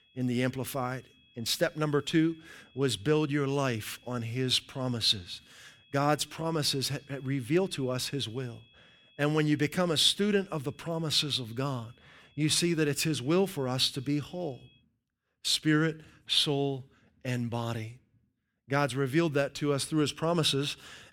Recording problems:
high-pitched whine; faint; until 15 s; 3.5 kHz, 30 dB below the speech

